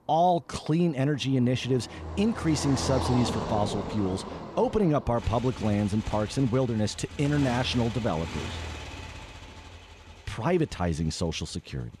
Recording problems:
traffic noise; loud; throughout; 9 dB below the speech

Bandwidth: 14 kHz